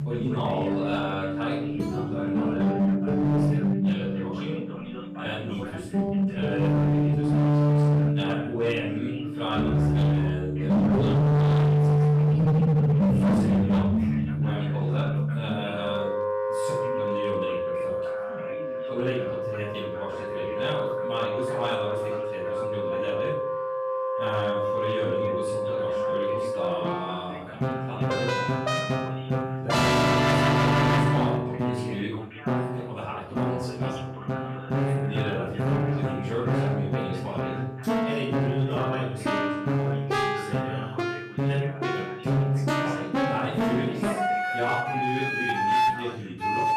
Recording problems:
distortion; heavy; 10% of the sound clipped
off-mic speech; far
room echo; noticeable; dies away in 0.6 s
background music; very loud; throughout; 8 dB above the speech
voice in the background; loud; throughout; 9 dB below the speech

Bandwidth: 14.5 kHz